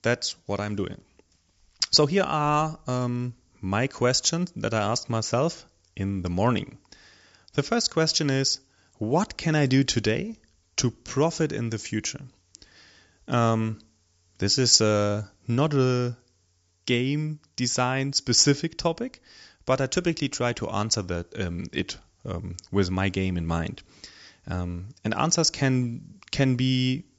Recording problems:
high frequencies cut off; noticeable; nothing above 8 kHz

